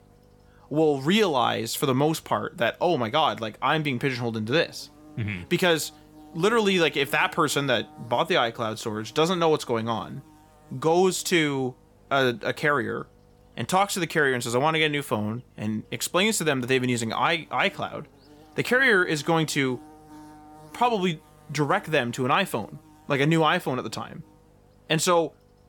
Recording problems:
electrical hum; faint; throughout; 50 Hz, 30 dB below the speech

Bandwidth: 18 kHz